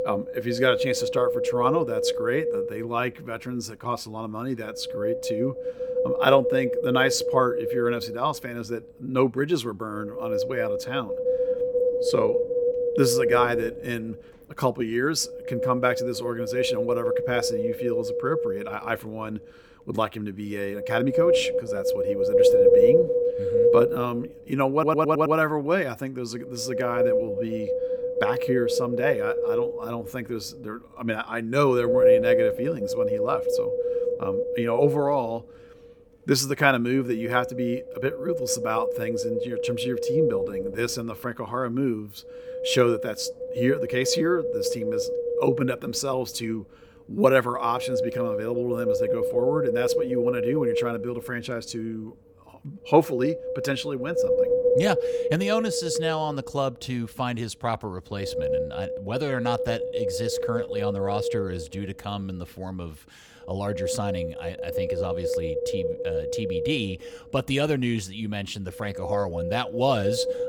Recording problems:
wind noise on the microphone; heavy; 2 dB above the speech
audio stuttering; at 25 s

